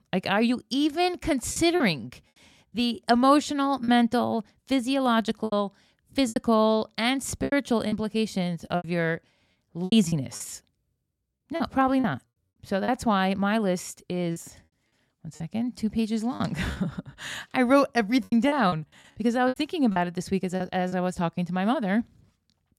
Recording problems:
choppy; very; 8% of the speech affected

